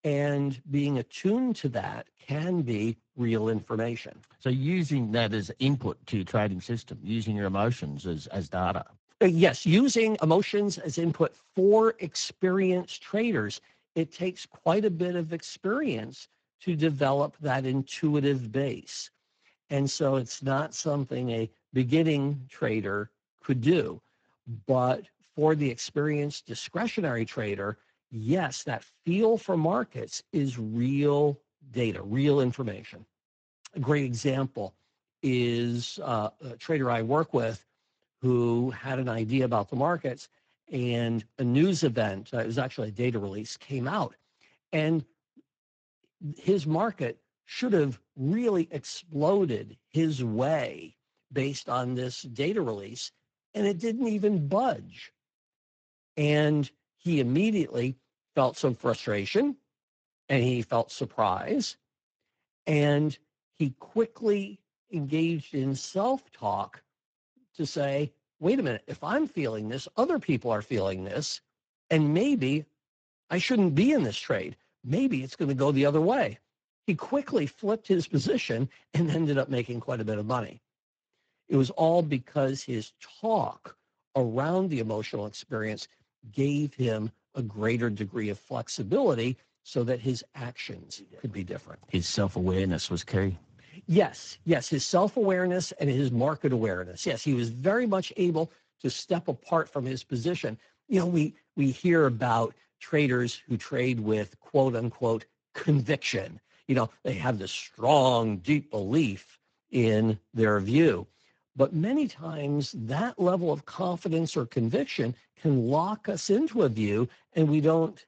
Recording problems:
garbled, watery; slightly; nothing above 7.5 kHz
uneven, jittery; strongly; from 4.5 s to 1:06

